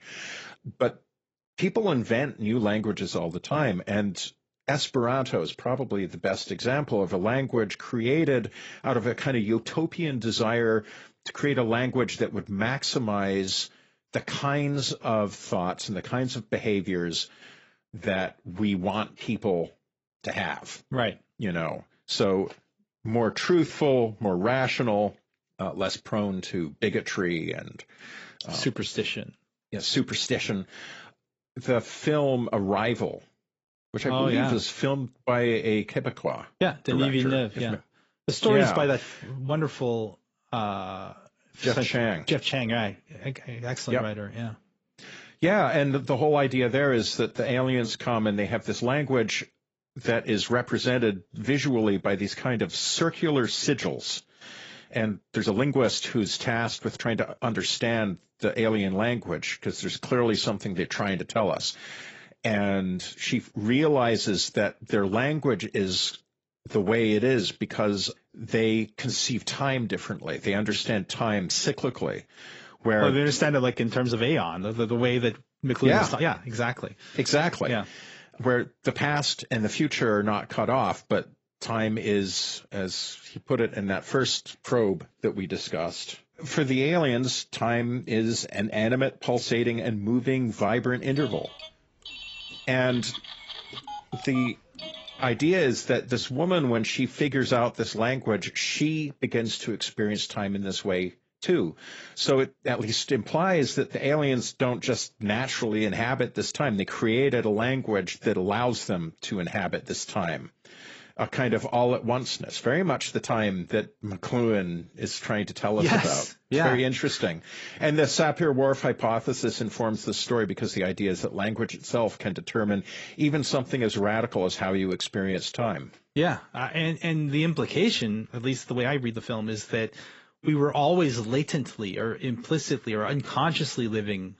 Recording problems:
garbled, watery; badly; nothing above 7.5 kHz
uneven, jittery; strongly; from 15 s to 2:09
phone ringing; faint; from 1:31 to 1:36; peak 10 dB below the speech

